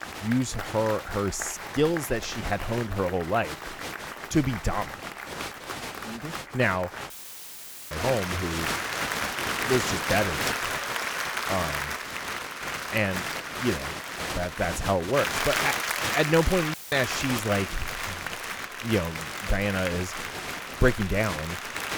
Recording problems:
crowd noise; loud; throughout; 3 dB below the speech
audio cutting out; filled with static; at 7 s for 1 s and at 17 s

